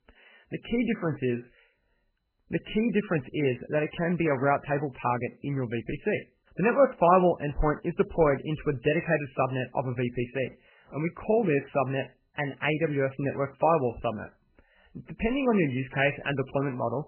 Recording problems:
garbled, watery; badly; nothing above 3 kHz

